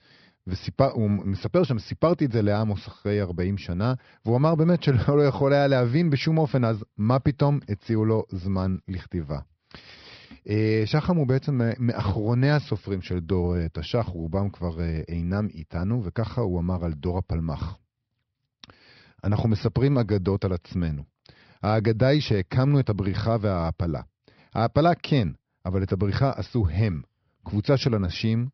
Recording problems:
high frequencies cut off; noticeable; nothing above 5.5 kHz

